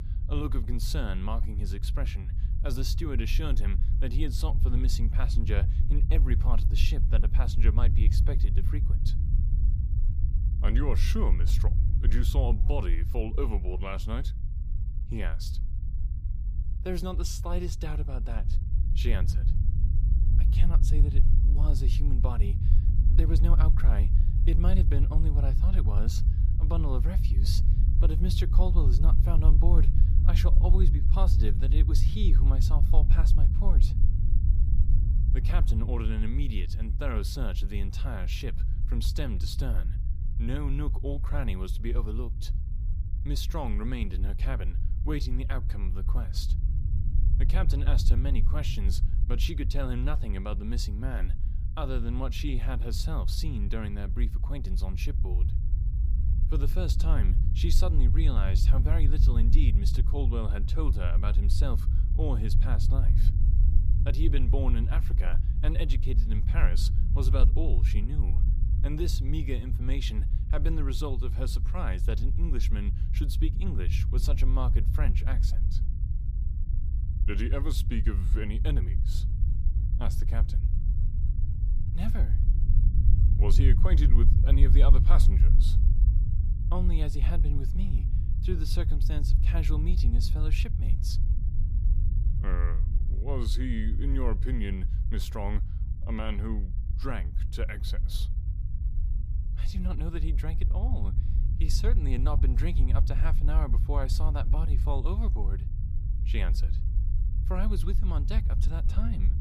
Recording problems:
low rumble; loud; throughout; 7 dB below the speech

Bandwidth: 14.5 kHz